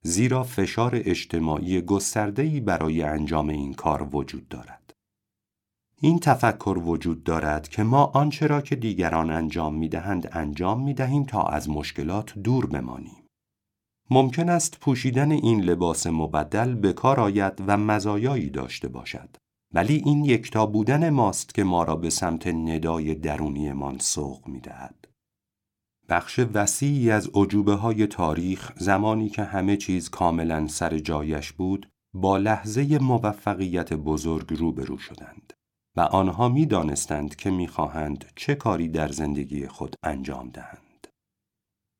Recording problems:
none

